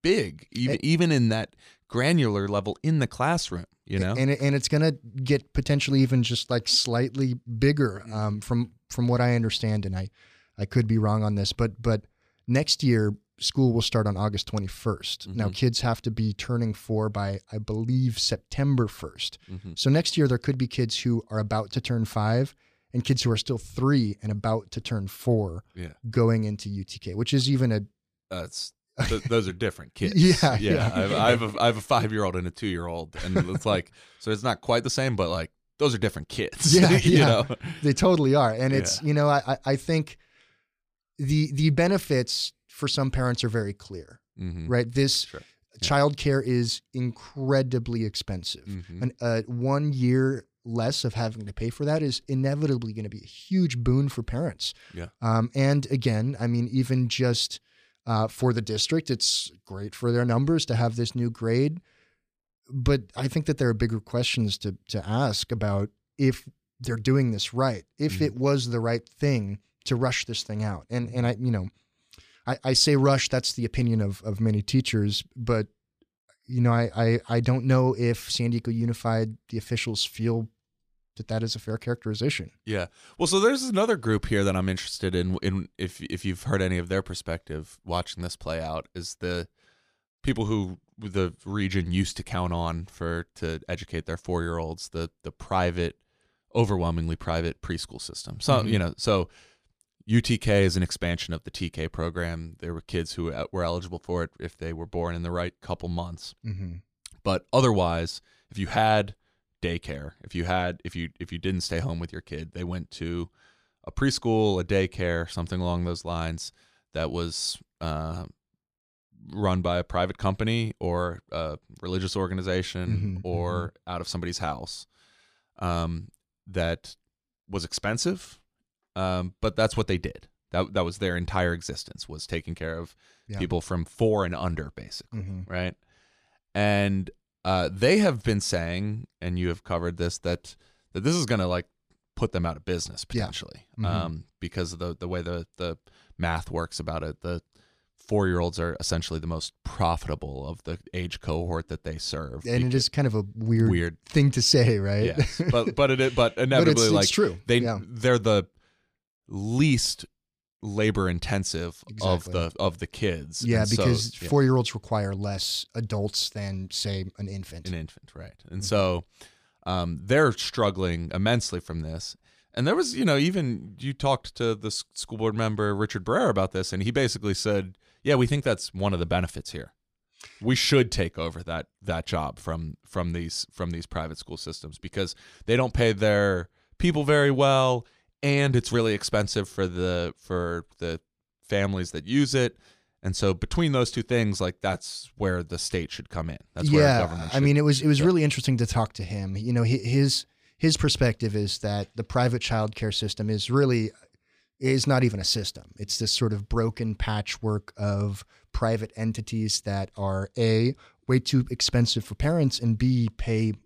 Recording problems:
none

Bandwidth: 14.5 kHz